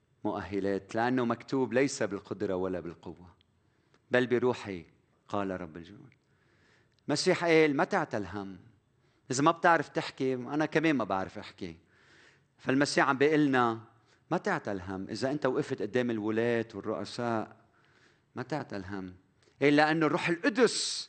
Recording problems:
garbled, watery; slightly; nothing above 8.5 kHz

